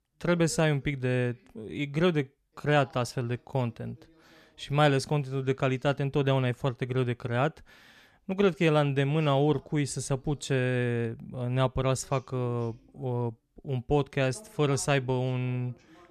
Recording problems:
voice in the background; faint; throughout; 30 dB below the speech

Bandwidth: 14 kHz